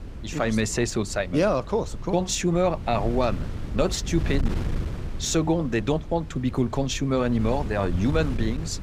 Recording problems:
wind noise on the microphone; occasional gusts; 15 dB below the speech

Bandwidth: 15.5 kHz